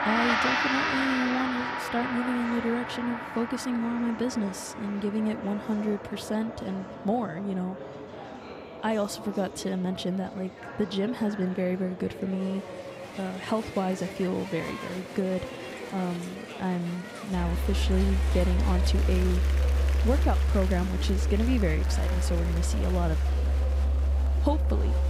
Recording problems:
background music; very loud; throughout; 3 dB above the speech
murmuring crowd; loud; throughout; 9 dB below the speech

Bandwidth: 15.5 kHz